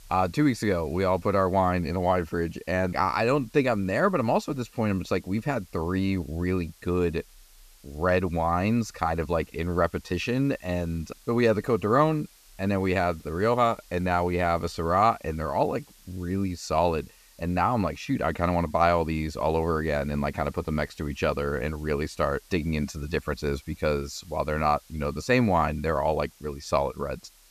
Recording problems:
hiss; faint; throughout; 25 dB below the speech

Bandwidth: 14.5 kHz